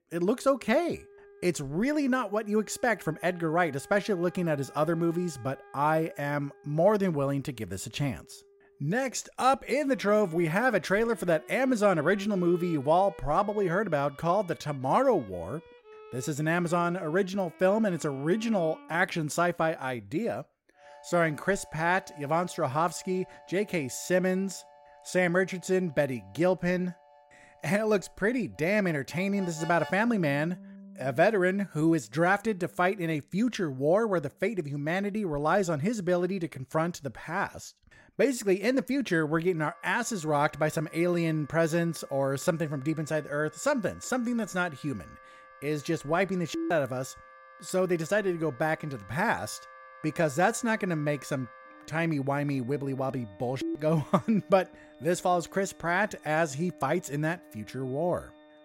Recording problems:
background music; faint; throughout; 25 dB below the speech

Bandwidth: 16 kHz